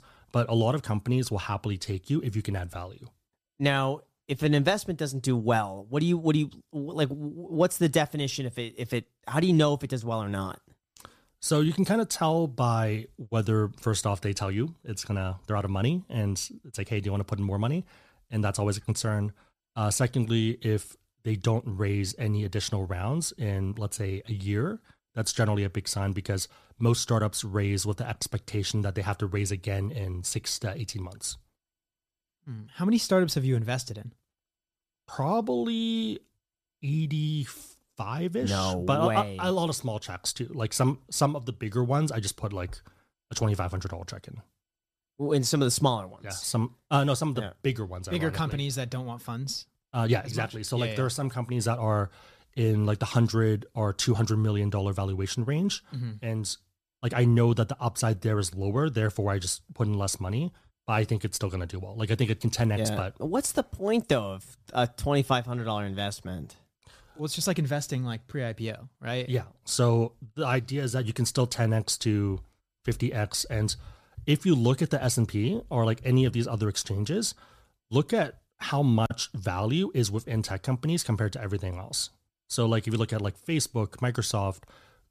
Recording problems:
uneven, jittery; slightly; from 15 s to 1:22

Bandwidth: 14.5 kHz